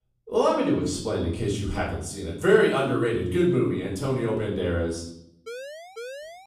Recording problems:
off-mic speech; far
room echo; noticeable; dies away in 0.6 s
siren; faint; from 5.5 s on; peak 15 dB below the speech

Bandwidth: 15 kHz